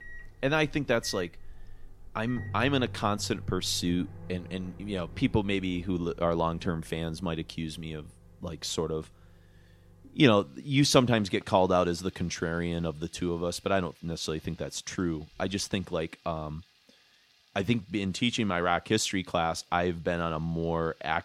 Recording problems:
household noises; noticeable; throughout; 20 dB below the speech

